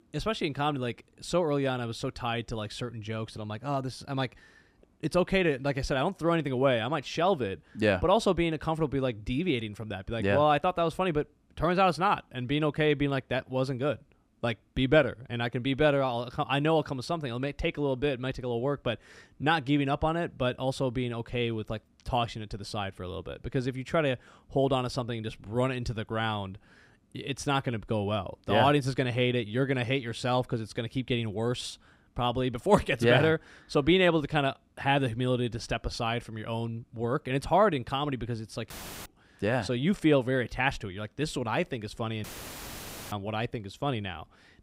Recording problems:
audio cutting out; filled with static; at 39 s and at 42 s for 1 s

